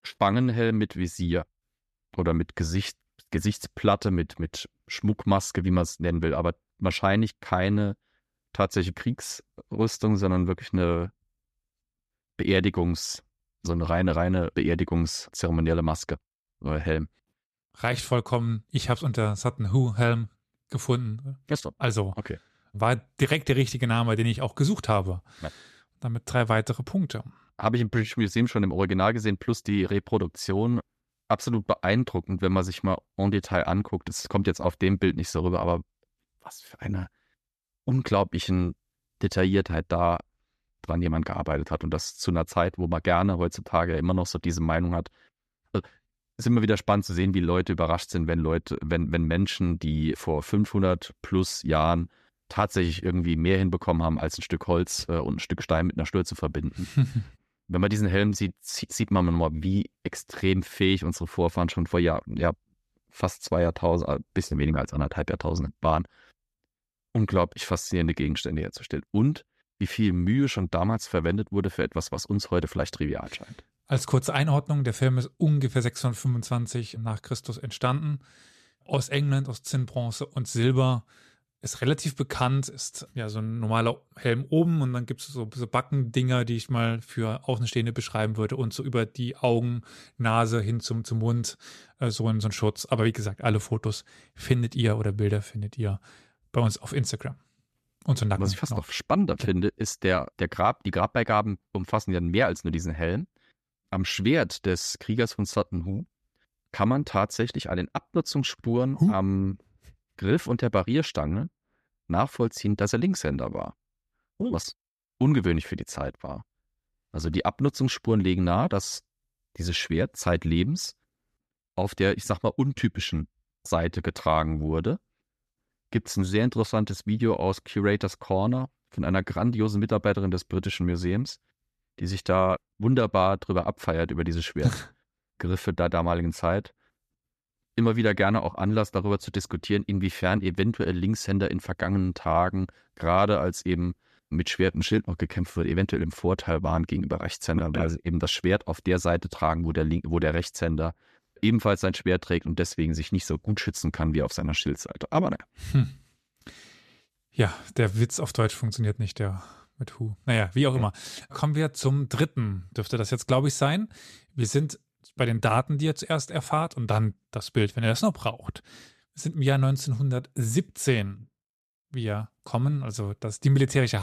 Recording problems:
abrupt cut into speech; at the end

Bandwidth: 13.5 kHz